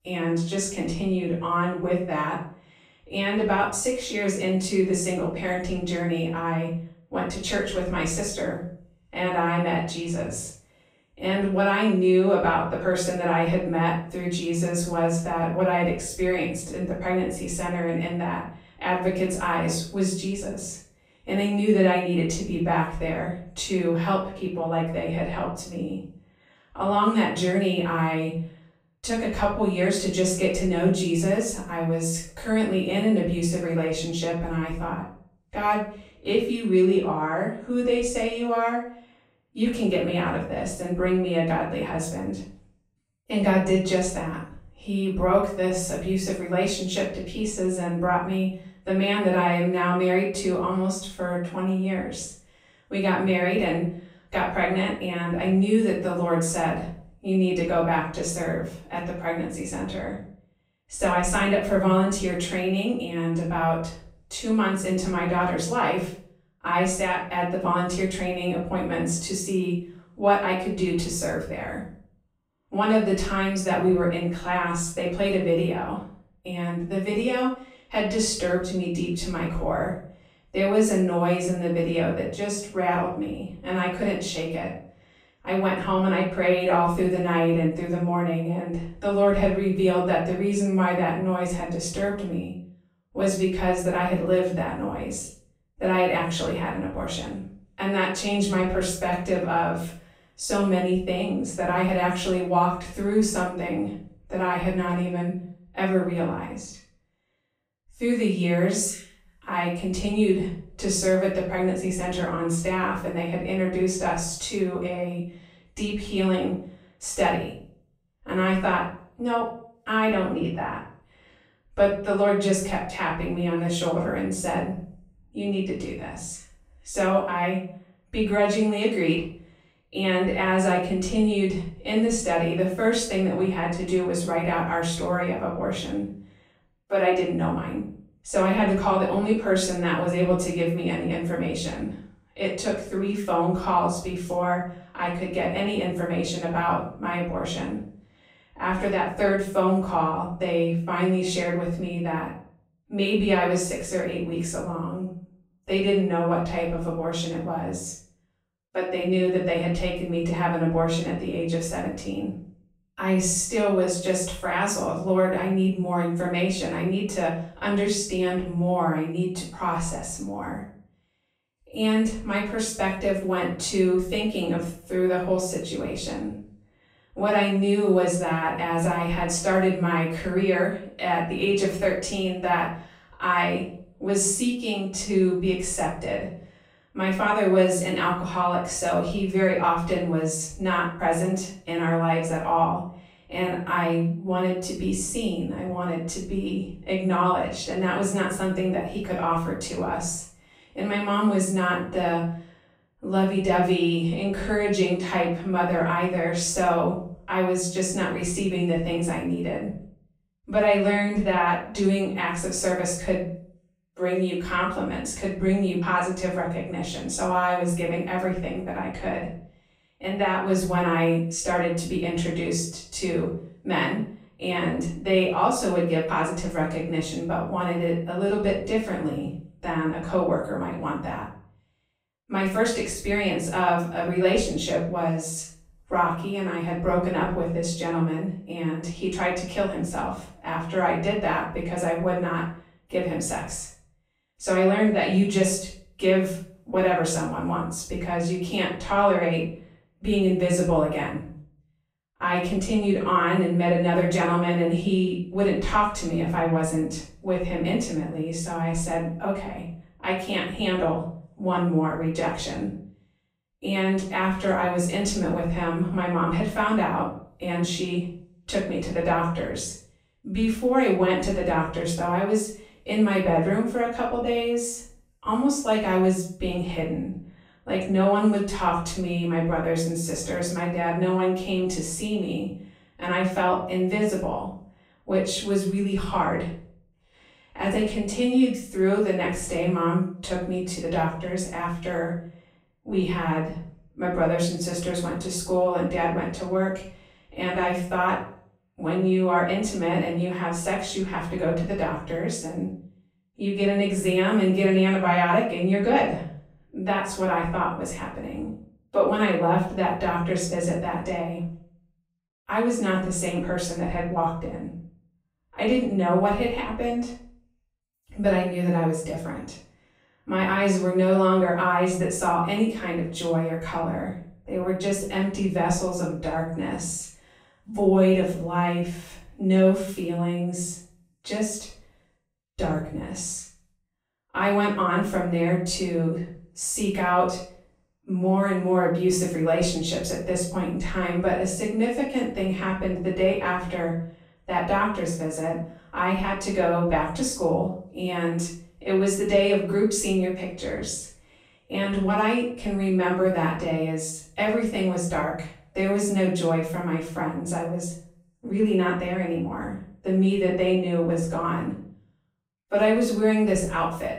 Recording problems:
off-mic speech; far
room echo; noticeable; dies away in 0.5 s

